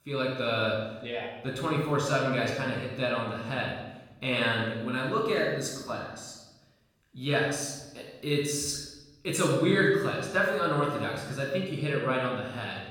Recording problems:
off-mic speech; far
room echo; noticeable; dies away in 0.9 s

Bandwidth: 18 kHz